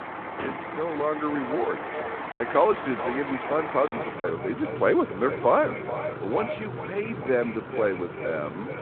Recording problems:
echo of what is said; strong; throughout; 430 ms later, 9 dB below the speech
phone-call audio; nothing above 3.5 kHz
traffic noise; loud; throughout; 8 dB below the speech
choppy; occasionally; from 2.5 to 4 s; 4% of the speech affected

